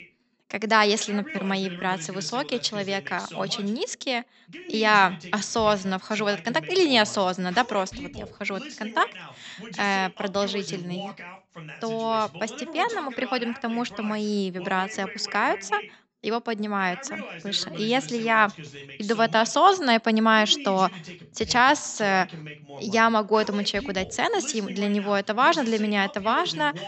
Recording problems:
high frequencies cut off; noticeable; nothing above 8 kHz
voice in the background; noticeable; throughout; 15 dB below the speech

